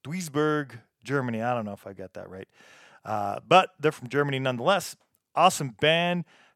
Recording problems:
none

